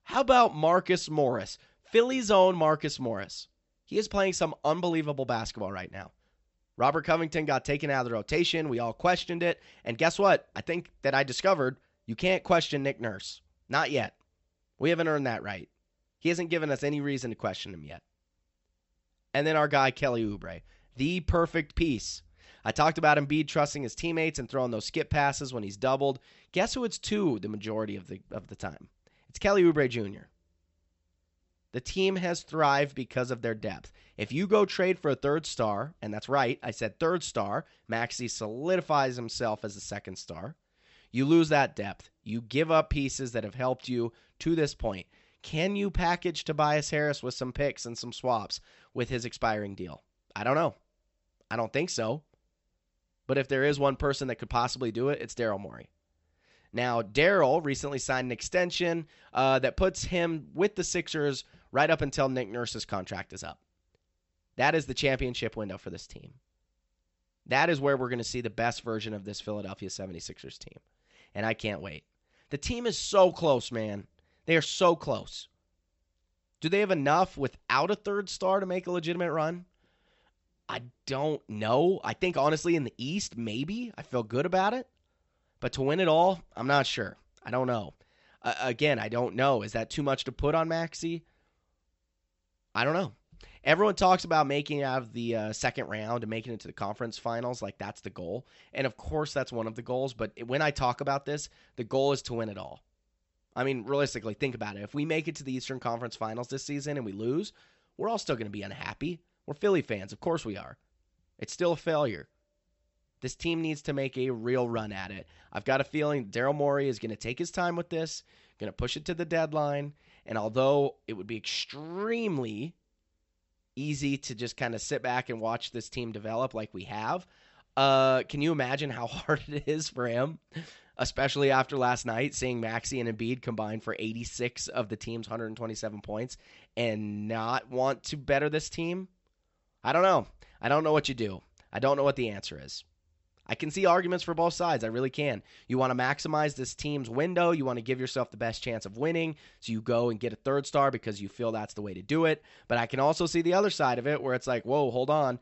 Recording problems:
high frequencies cut off; noticeable; nothing above 8 kHz

